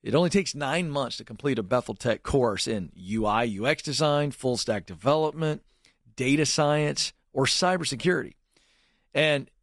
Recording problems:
garbled, watery; slightly; nothing above 10.5 kHz

